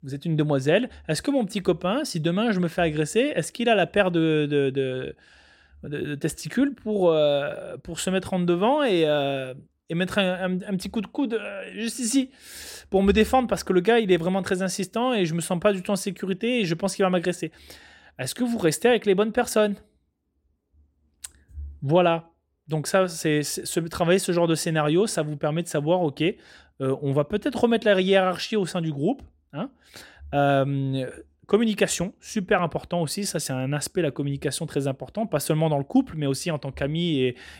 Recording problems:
none

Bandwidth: 16.5 kHz